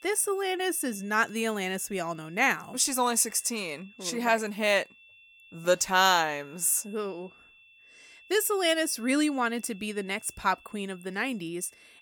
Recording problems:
high-pitched whine; faint; throughout; 2.5 kHz, 25 dB below the speech

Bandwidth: 18 kHz